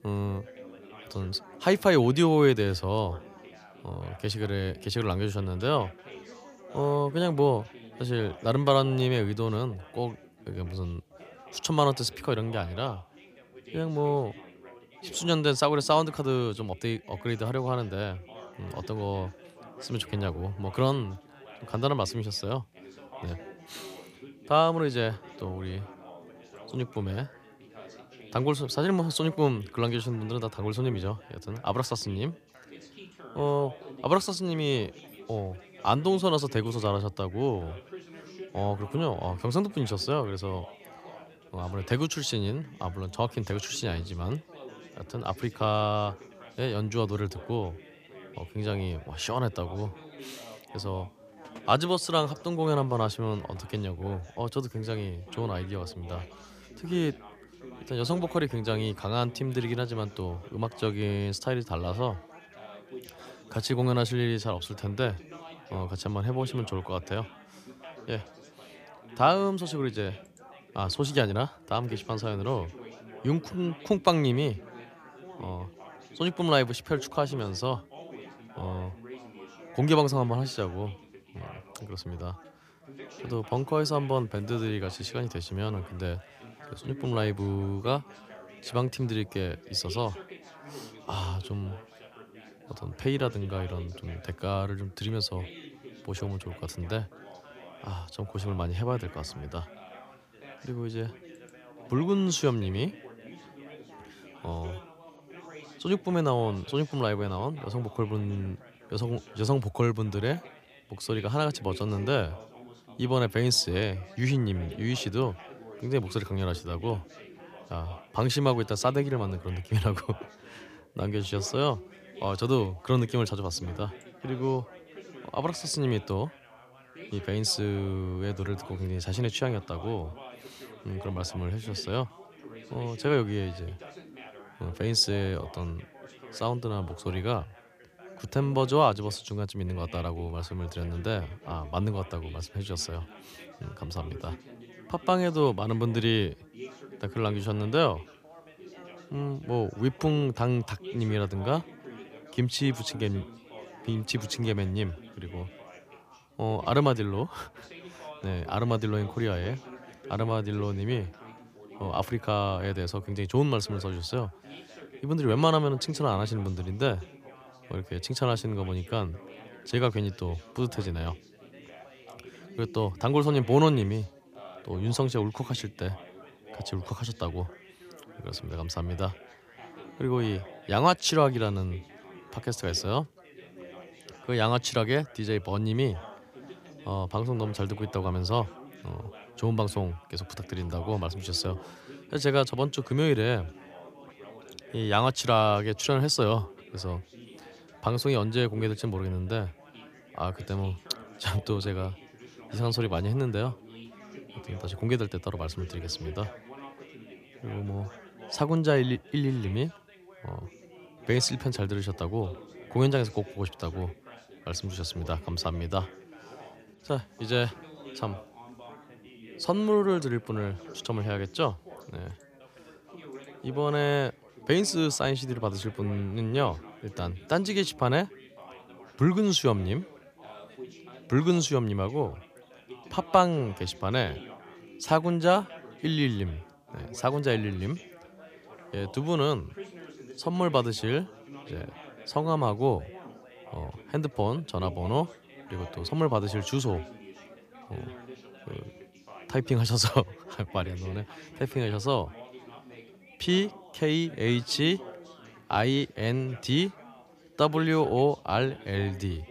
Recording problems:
background chatter; noticeable; throughout; 4 voices, 20 dB below the speech

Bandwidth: 15 kHz